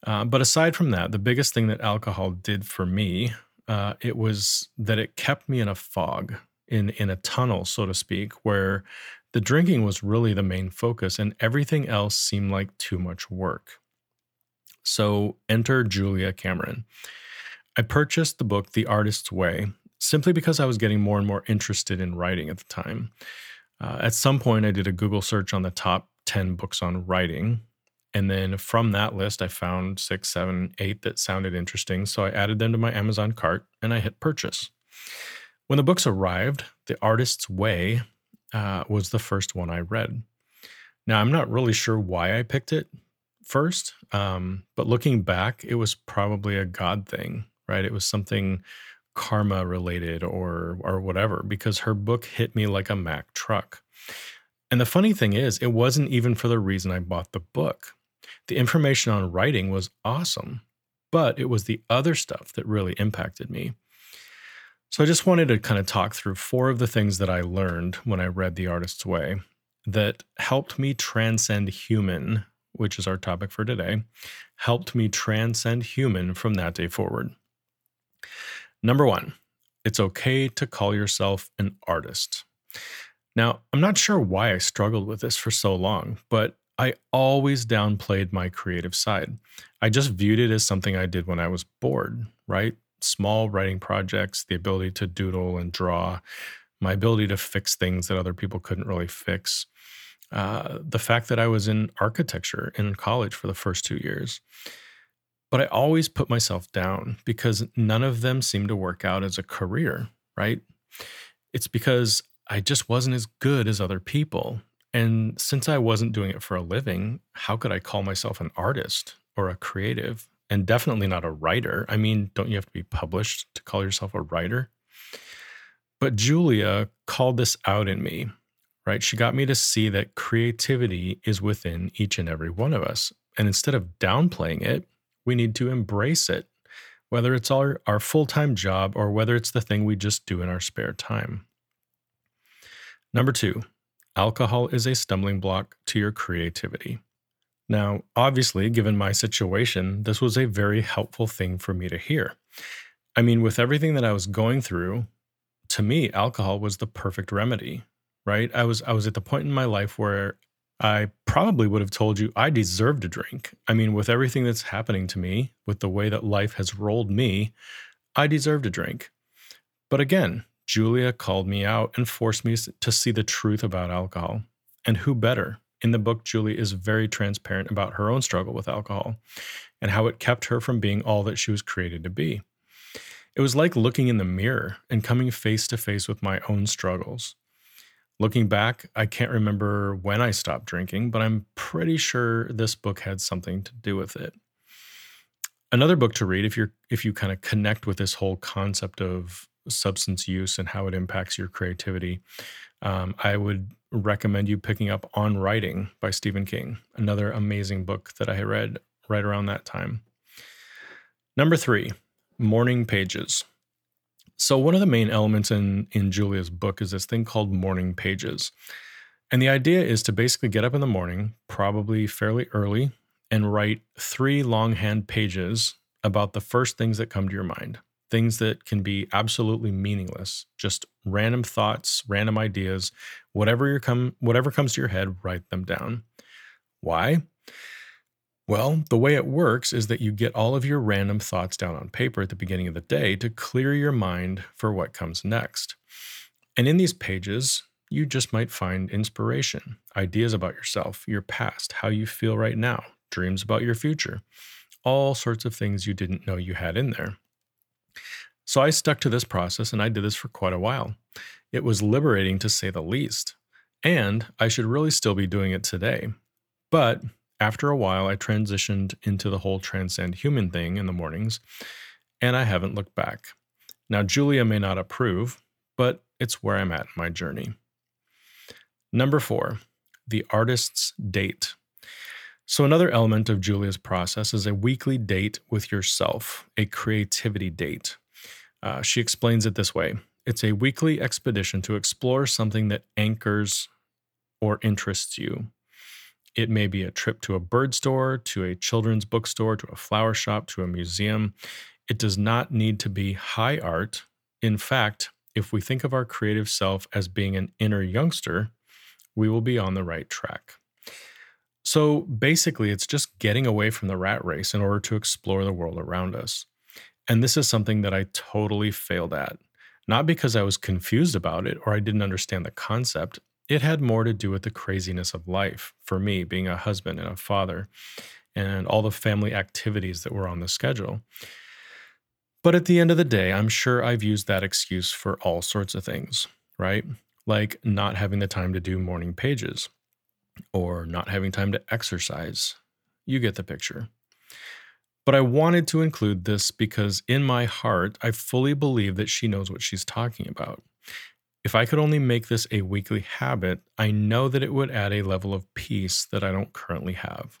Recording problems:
none

